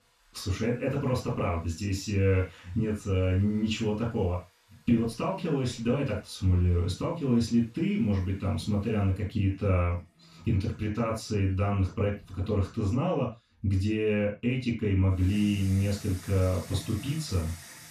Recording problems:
off-mic speech; far
room echo; noticeable; dies away in 0.2 s
household noises; faint; throughout; 20 dB below the speech

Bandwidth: 14.5 kHz